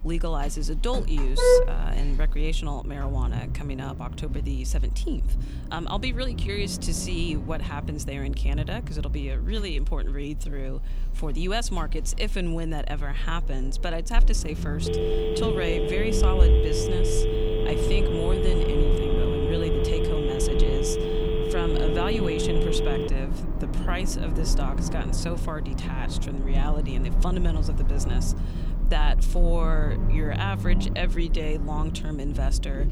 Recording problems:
traffic noise; very loud; throughout; 4 dB above the speech
phone ringing; loud; from 15 to 23 s; peak 6 dB above the speech

